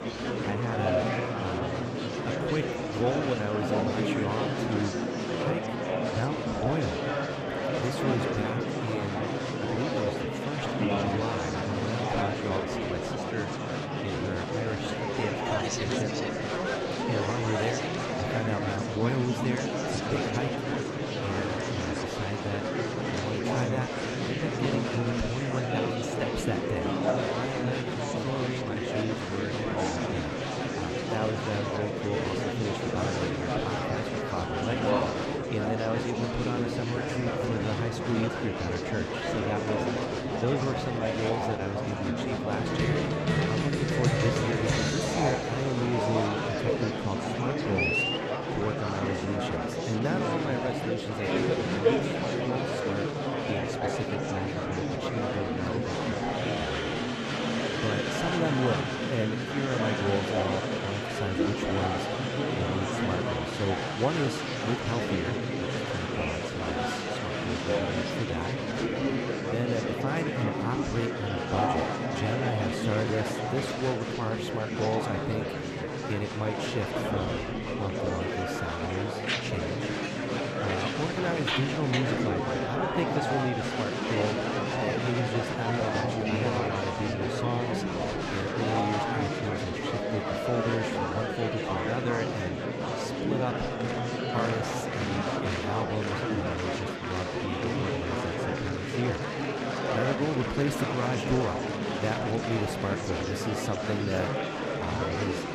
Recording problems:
murmuring crowd; very loud; throughout; 4 dB above the speech

